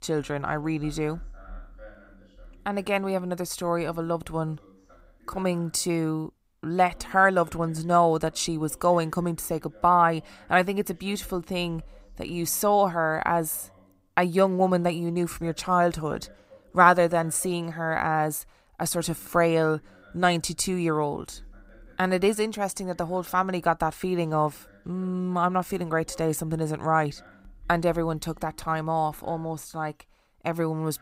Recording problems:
voice in the background; faint; throughout; 30 dB below the speech

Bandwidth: 15.5 kHz